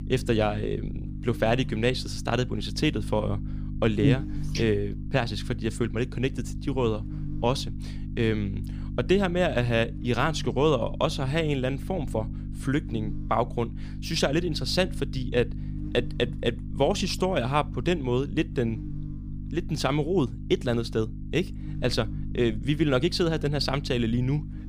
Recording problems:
electrical hum; noticeable; throughout; 50 Hz, 15 dB below the speech

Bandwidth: 15 kHz